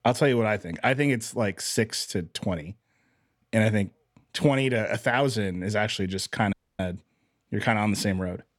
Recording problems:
audio cutting out; at 6.5 s

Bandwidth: 17.5 kHz